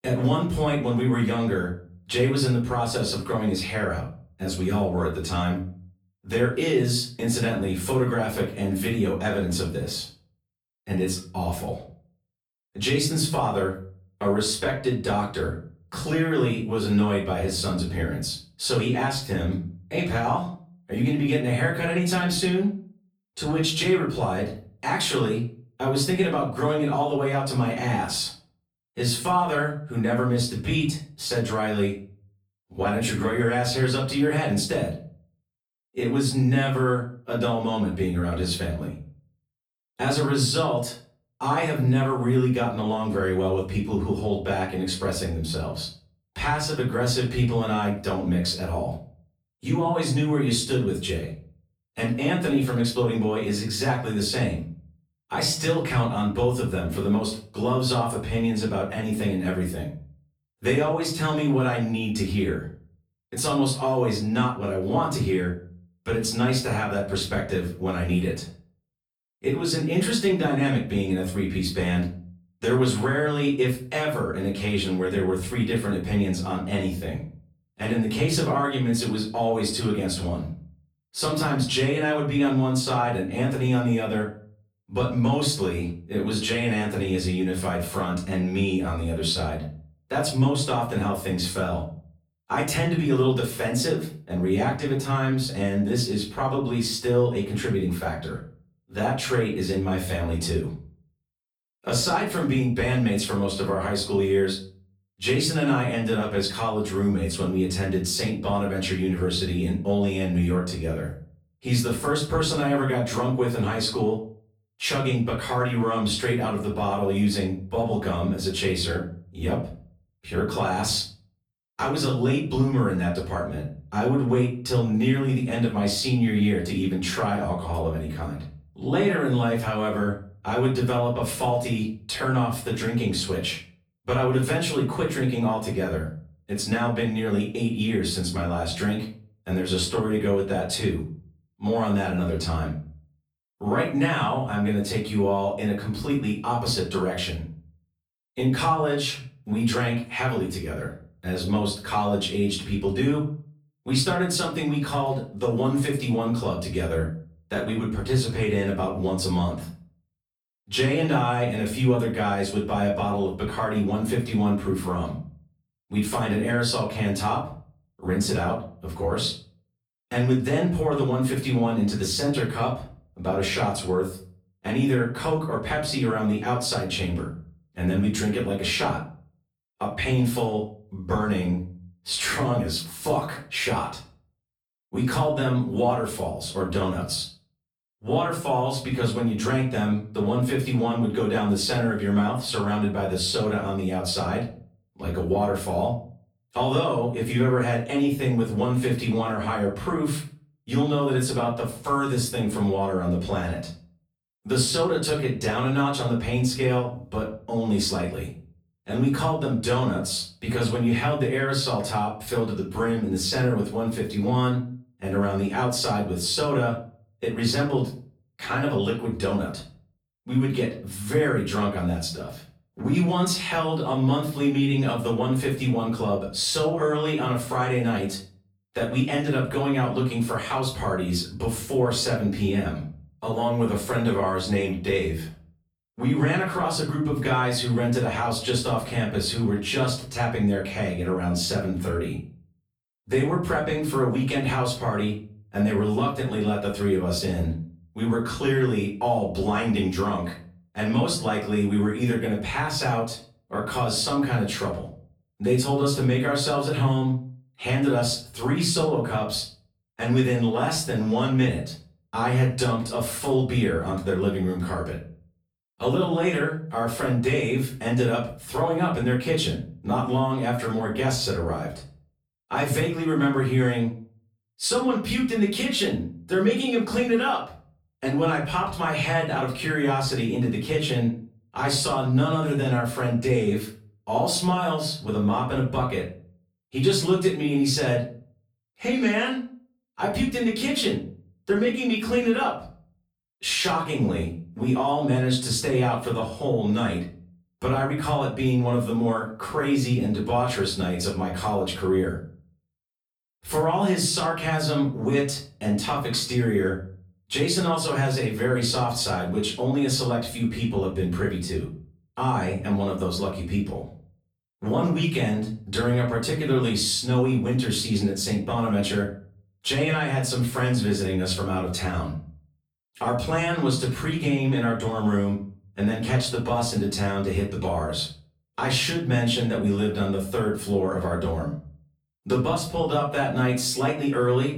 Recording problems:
off-mic speech; far
room echo; slight; dies away in 0.4 s

